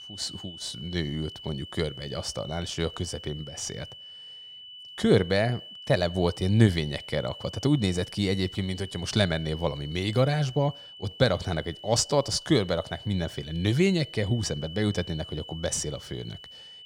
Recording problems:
high-pitched whine; noticeable; throughout; 3 kHz, 15 dB below the speech

